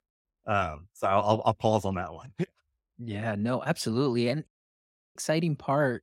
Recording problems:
audio cutting out; at 4.5 s for 0.5 s

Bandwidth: 16 kHz